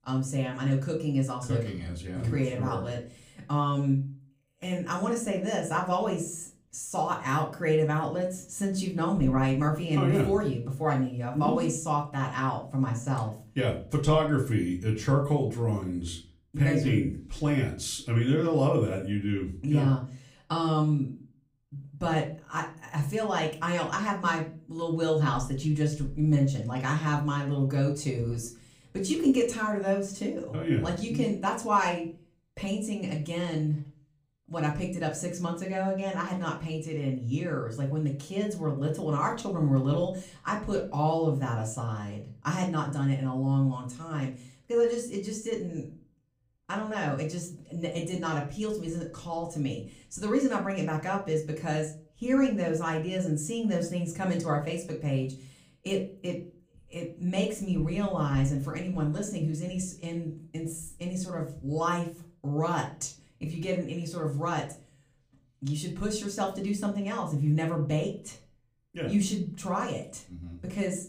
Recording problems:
off-mic speech; far
room echo; very slight; dies away in 0.3 s

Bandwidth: 15.5 kHz